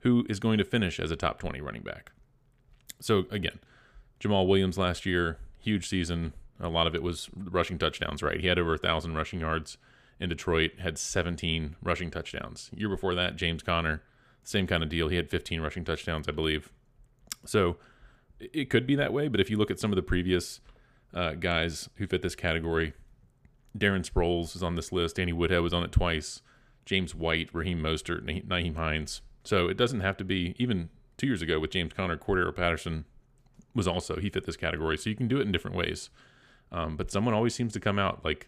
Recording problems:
none

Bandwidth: 15 kHz